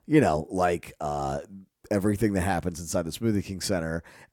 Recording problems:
none

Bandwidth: 18 kHz